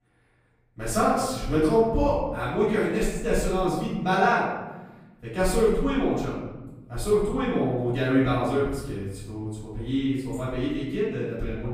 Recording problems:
off-mic speech; far
room echo; noticeable; dies away in 1.3 s

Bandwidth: 15.5 kHz